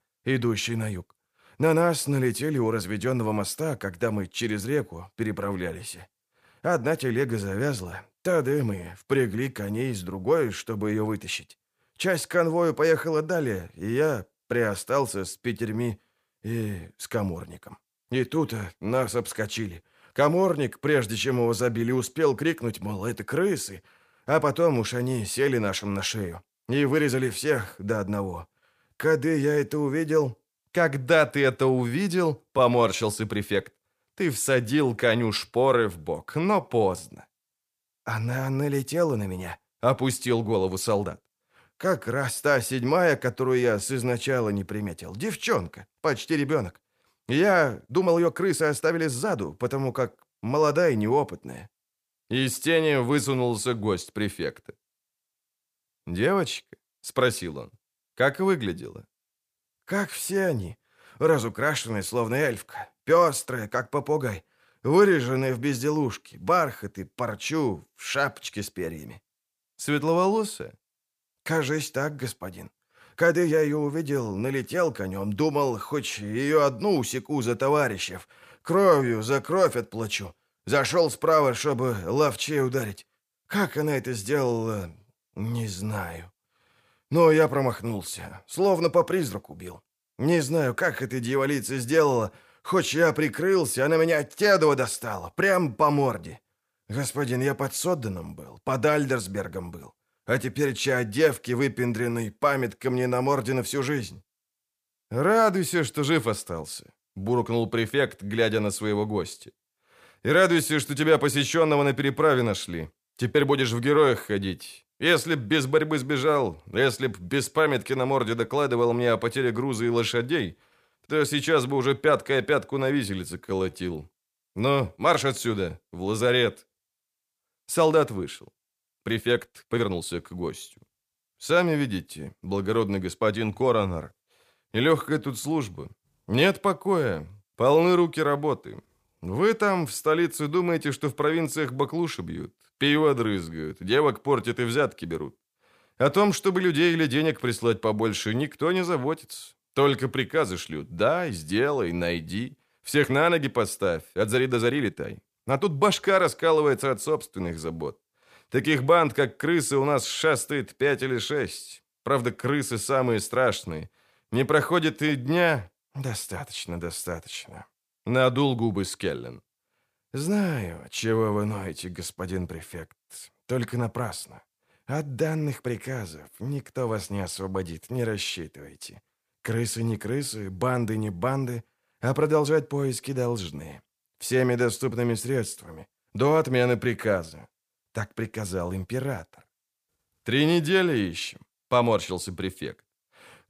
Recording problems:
uneven, jittery; strongly; from 33 s to 2:36

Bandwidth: 15 kHz